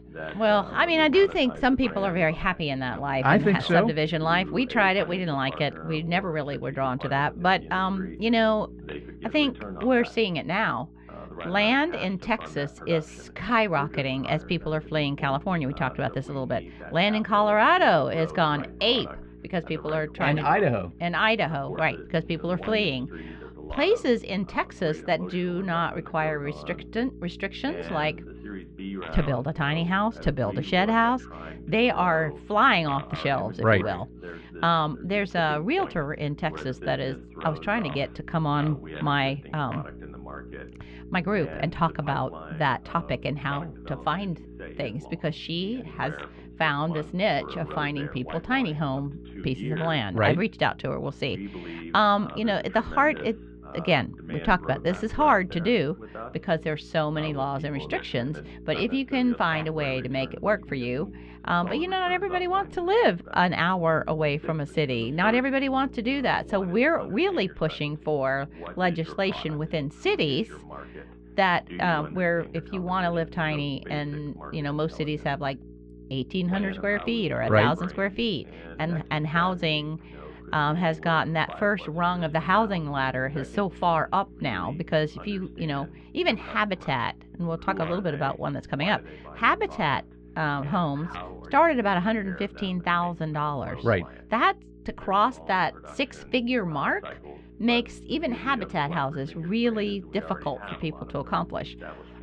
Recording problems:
muffled; slightly; fading above 3.5 kHz
voice in the background; noticeable; throughout; 15 dB below the speech
electrical hum; faint; throughout; 60 Hz, 25 dB below the speech

